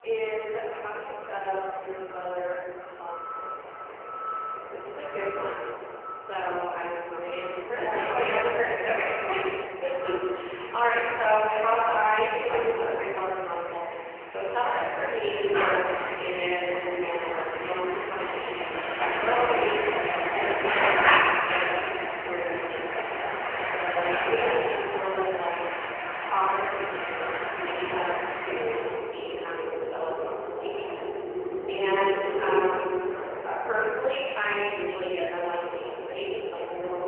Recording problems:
phone-call audio; poor line; nothing above 3 kHz
off-mic speech; far
room echo; noticeable; dies away in 1.6 s
traffic noise; loud; throughout; 1 dB below the speech

